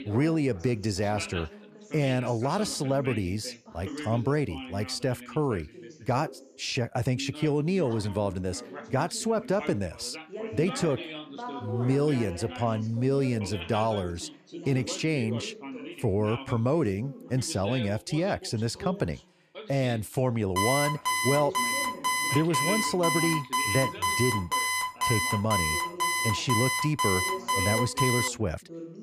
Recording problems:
background chatter; noticeable; throughout; 2 voices, 10 dB below the speech
alarm; loud; from 21 to 28 s; peak 3 dB above the speech

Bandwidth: 14.5 kHz